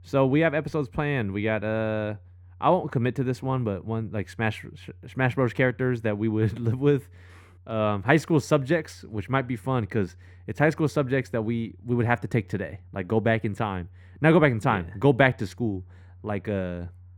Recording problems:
muffled; very; fading above 3 kHz

